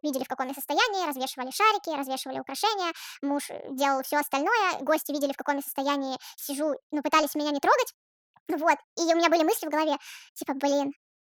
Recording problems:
wrong speed and pitch; too fast and too high; 1.5 times normal speed

